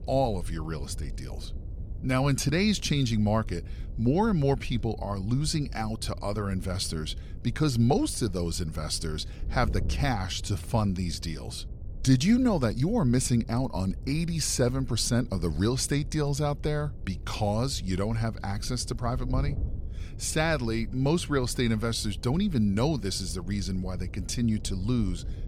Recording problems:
wind noise on the microphone; occasional gusts; 20 dB below the speech

